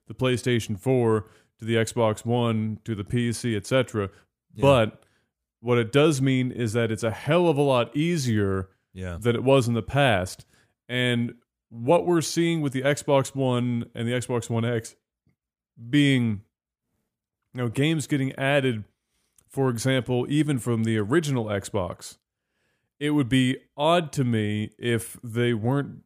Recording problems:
none

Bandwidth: 15 kHz